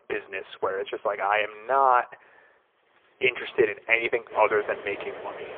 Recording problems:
phone-call audio; poor line
traffic noise; noticeable; from 3 s on; 15 dB below the speech

